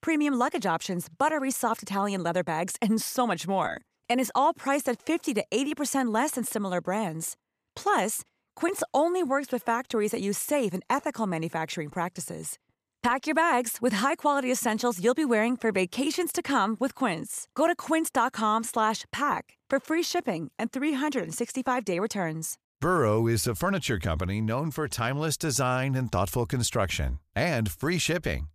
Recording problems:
none

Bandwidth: 14.5 kHz